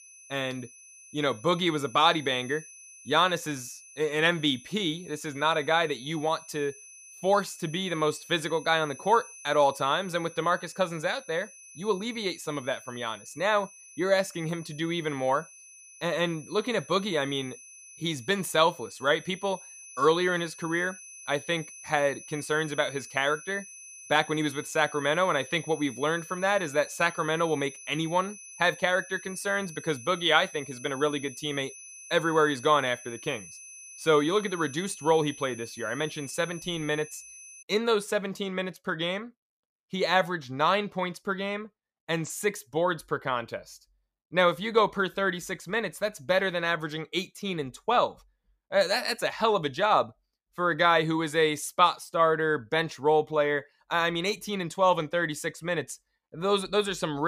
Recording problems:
high-pitched whine; noticeable; until 38 s; 6 kHz, 15 dB below the speech
abrupt cut into speech; at the end

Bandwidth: 15 kHz